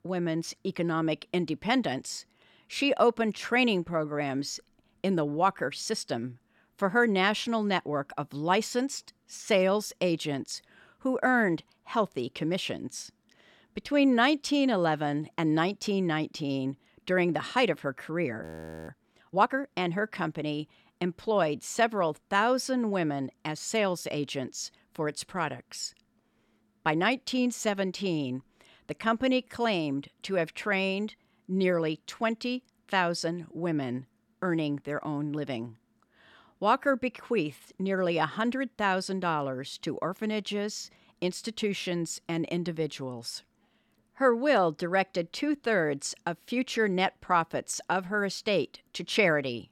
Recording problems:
audio freezing; at 18 s

